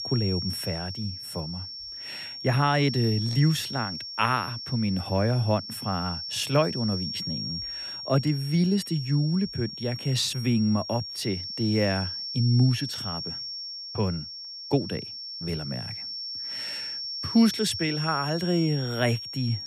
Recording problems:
high-pitched whine; loud; throughout; 5.5 kHz, 6 dB below the speech

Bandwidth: 14.5 kHz